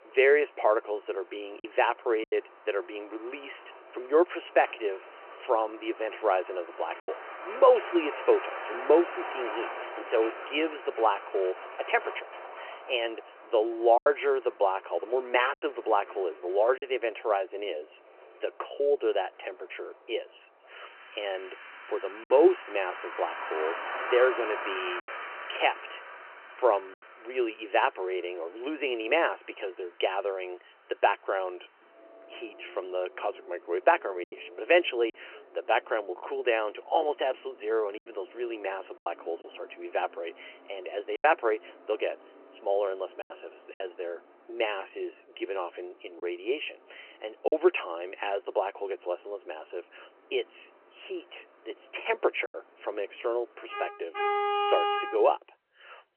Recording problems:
phone-call audio; nothing above 2.5 kHz
traffic noise; loud; throughout; 9 dB below the speech
choppy; occasionally; 3% of the speech affected

